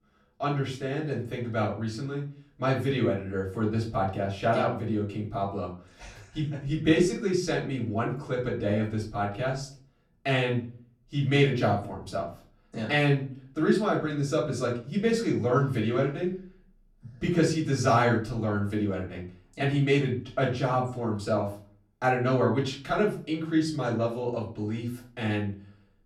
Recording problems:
off-mic speech; far
room echo; slight; dies away in 0.4 s

